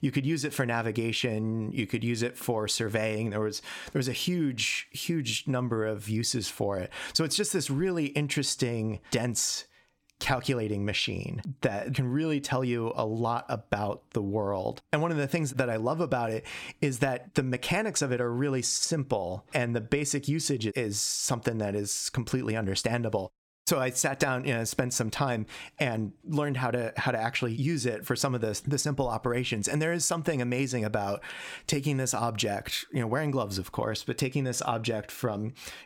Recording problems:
squashed, flat; somewhat

